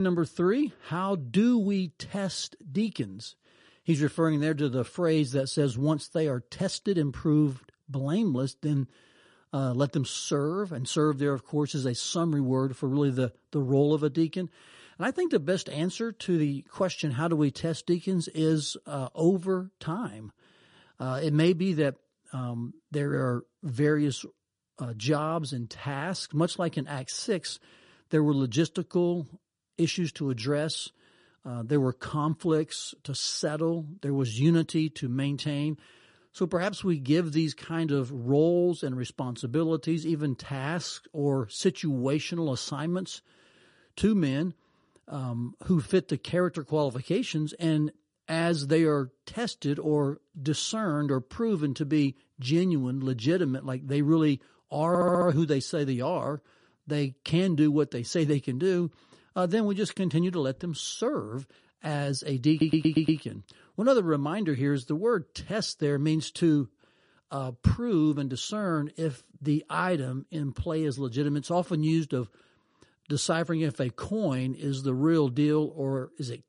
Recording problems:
garbled, watery; slightly; nothing above 10.5 kHz
abrupt cut into speech; at the start
audio stuttering; at 55 s and at 1:03

